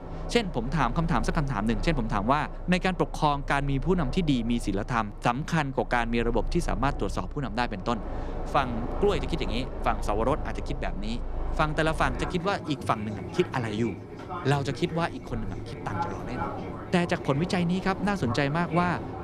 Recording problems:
train or aircraft noise; loud; throughout; 9 dB below the speech

